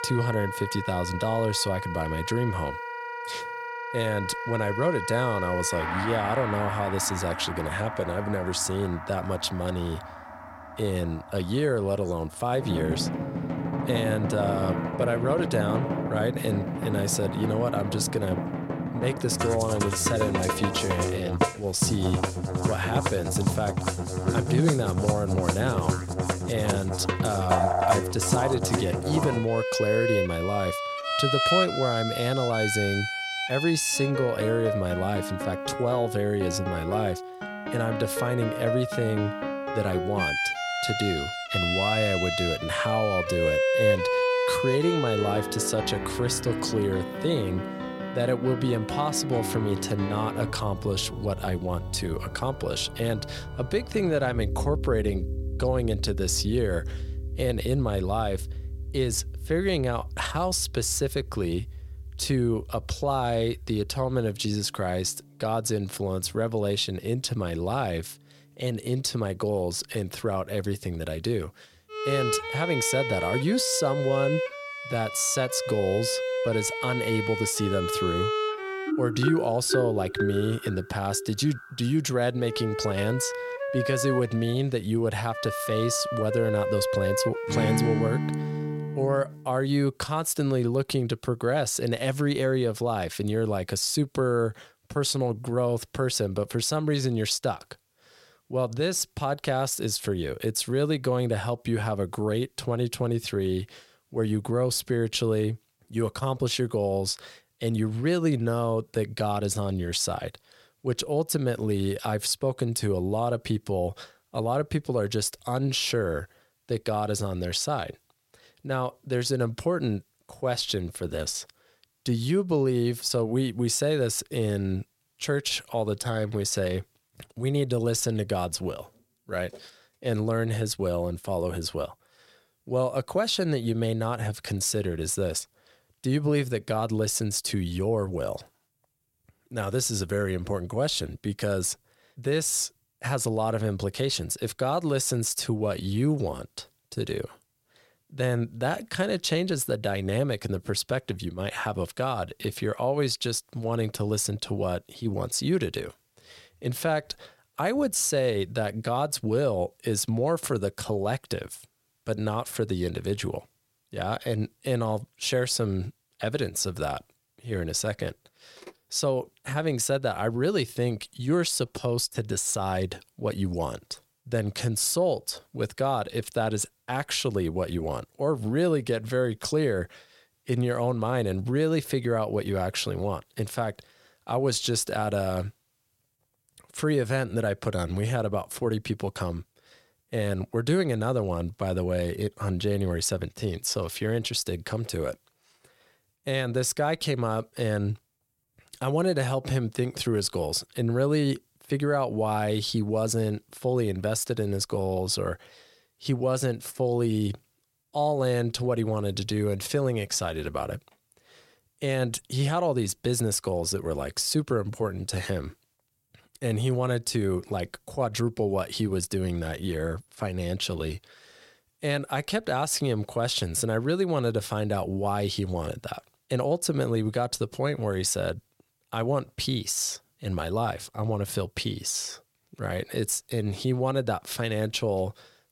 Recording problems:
background music; loud; until 1:29; 2 dB below the speech

